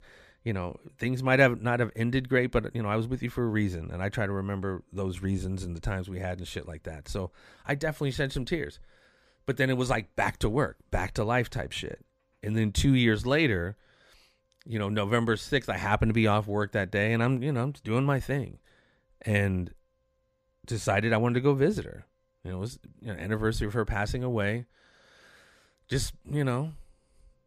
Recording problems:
none

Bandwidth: 14.5 kHz